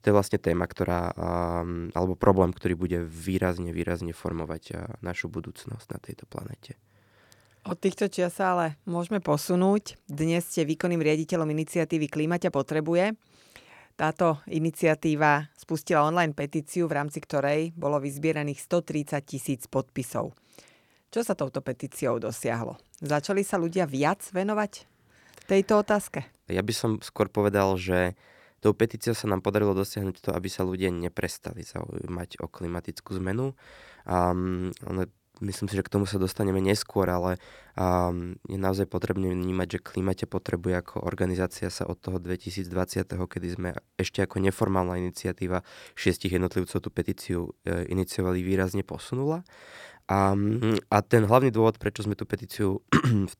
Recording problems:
none

